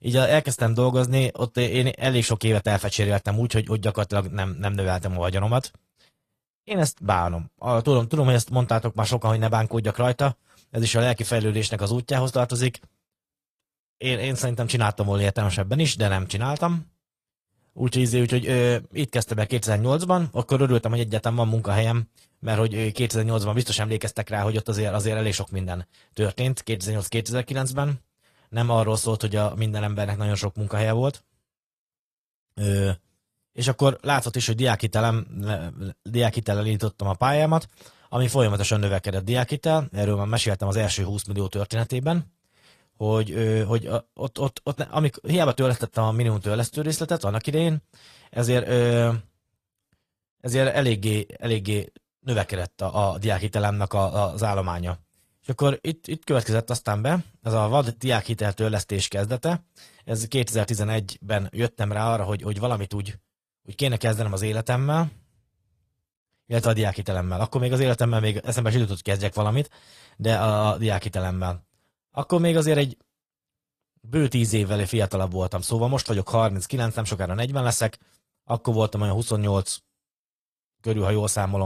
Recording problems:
garbled, watery; slightly; nothing above 14.5 kHz
abrupt cut into speech; at the end

